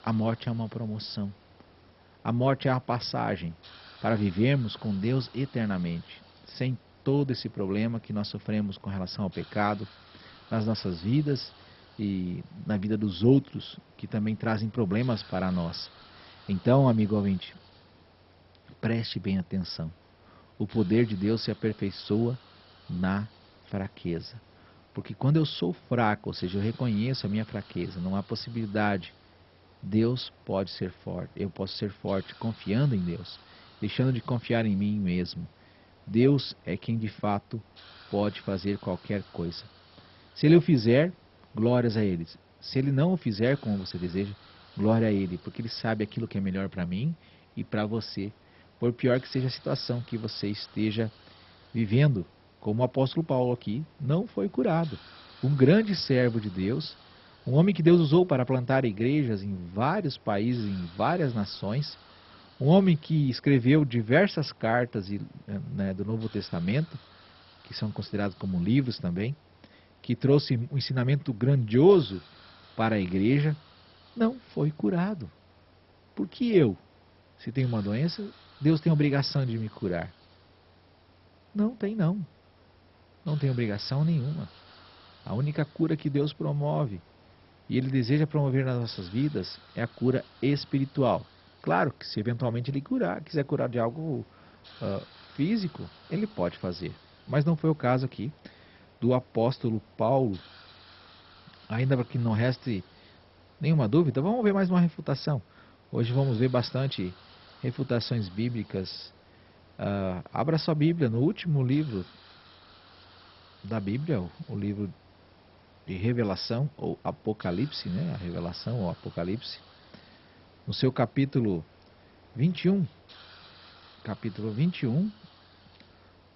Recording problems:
garbled, watery; badly; nothing above 5.5 kHz
hiss; faint; throughout; 25 dB below the speech

